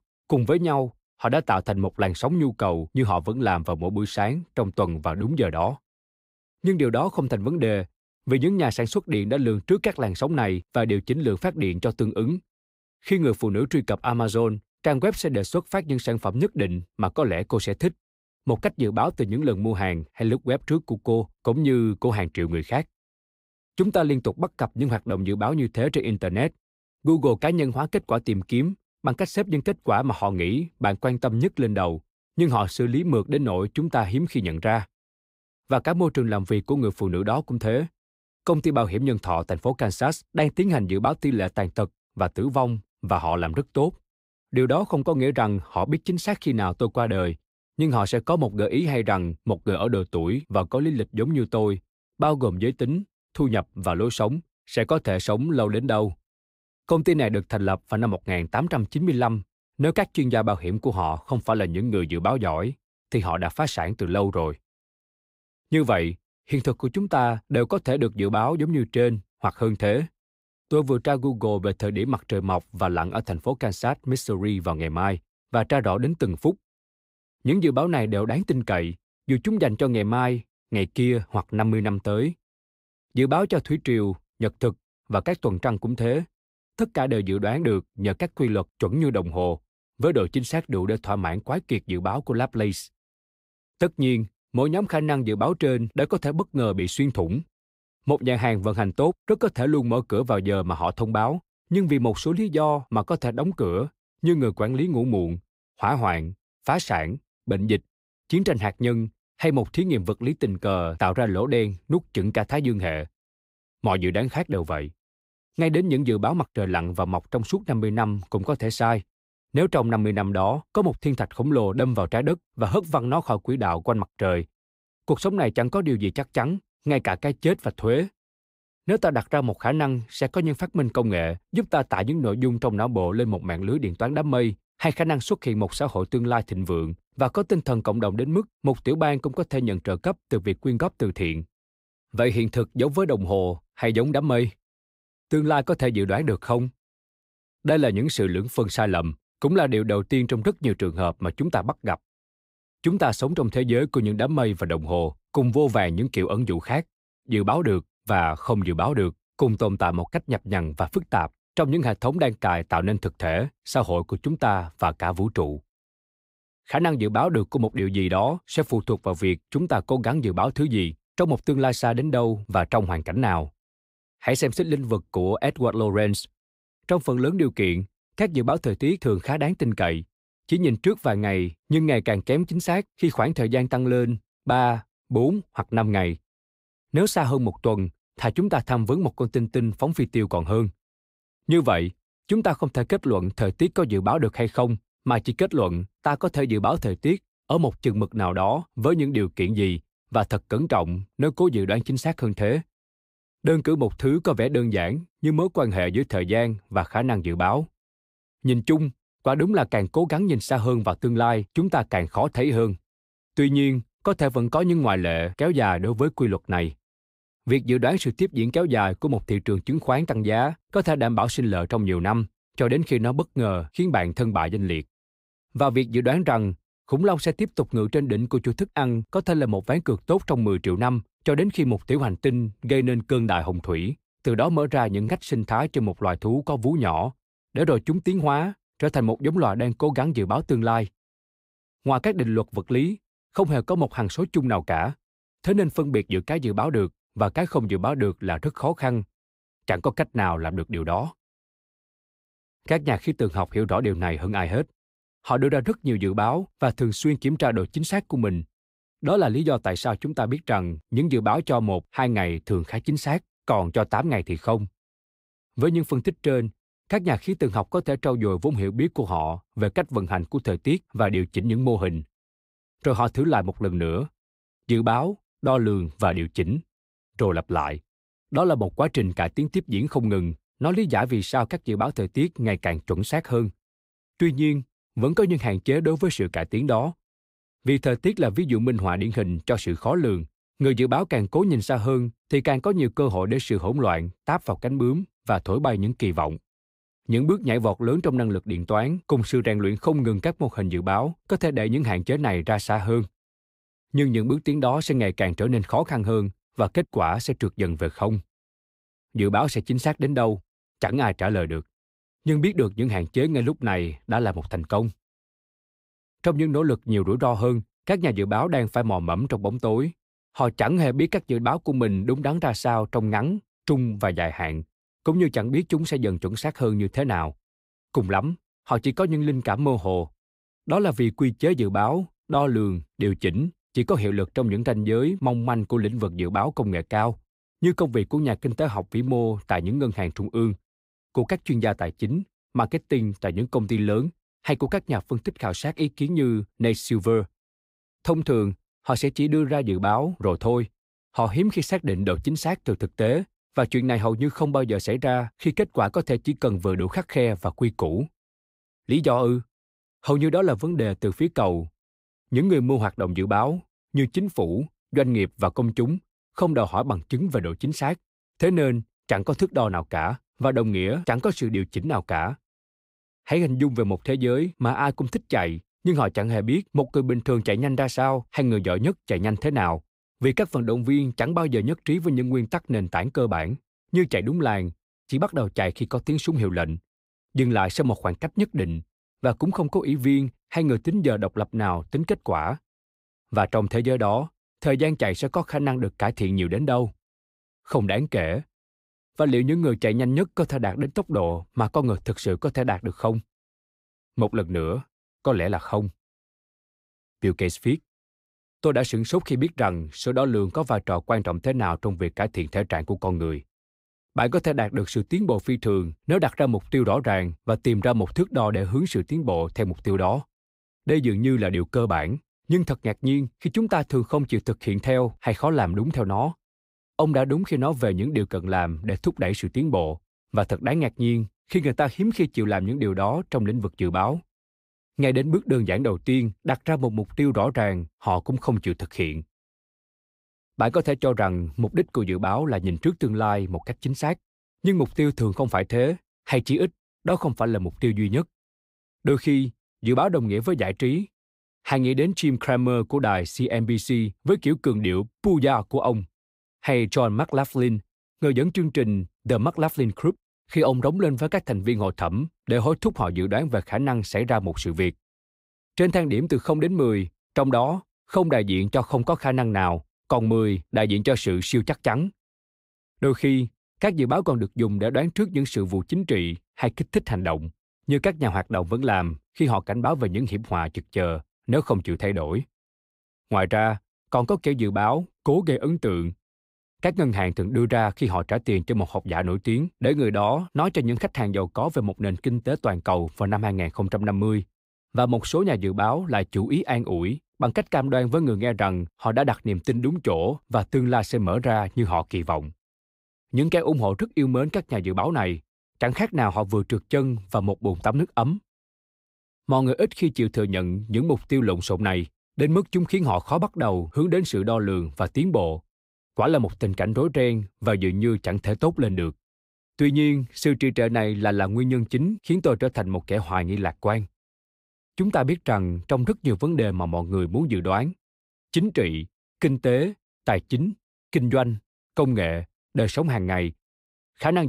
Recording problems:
abrupt cut into speech; at the end

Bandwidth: 15.5 kHz